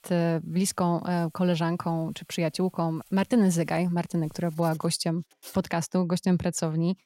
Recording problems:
household noises; faint; throughout; 25 dB below the speech

